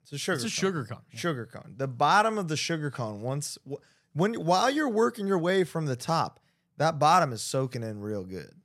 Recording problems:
none

